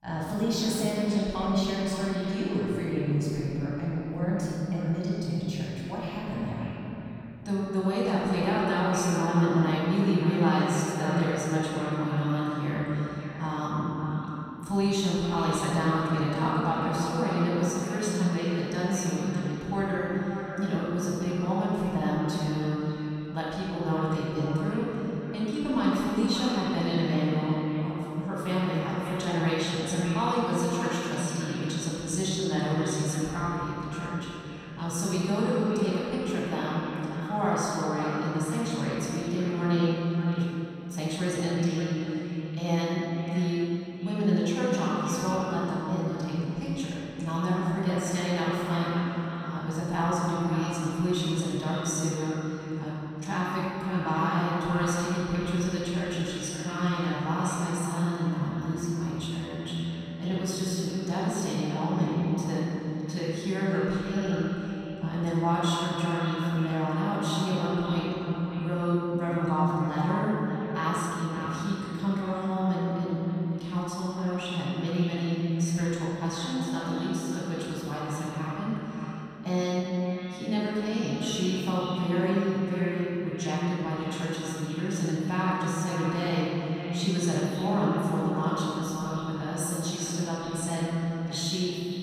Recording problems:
room echo; strong; dies away in 3 s
off-mic speech; far
echo of what is said; noticeable; throughout; 580 ms later, 10 dB below the speech

